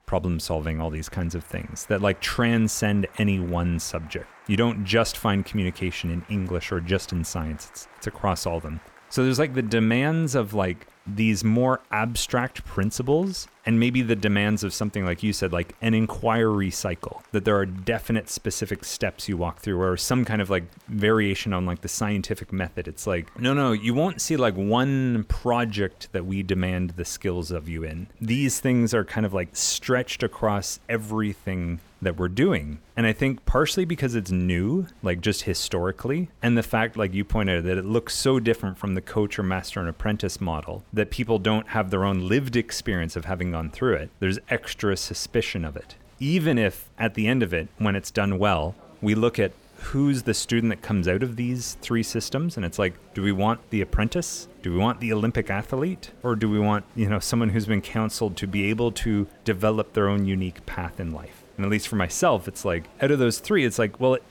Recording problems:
crowd noise; faint; throughout; 25 dB below the speech

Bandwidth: 18.5 kHz